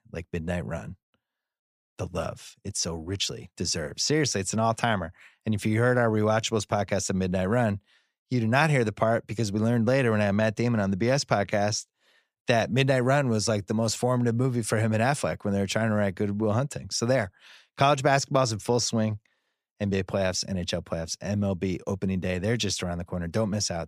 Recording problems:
none

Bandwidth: 15 kHz